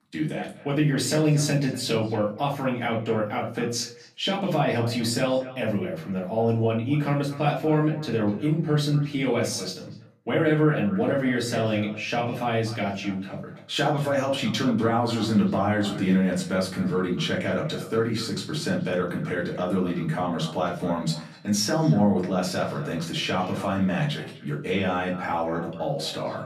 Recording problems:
off-mic speech; far
echo of what is said; faint; throughout; 240 ms later, 20 dB below the speech
room echo; slight; dies away in 0.4 s

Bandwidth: 14.5 kHz